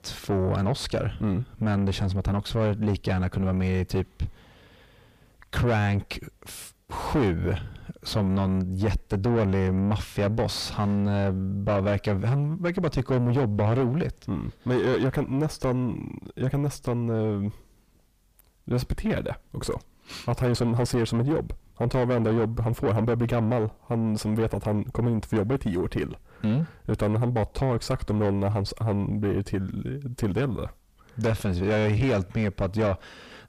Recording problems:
distortion; heavy; 6 dB below the speech

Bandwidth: 15 kHz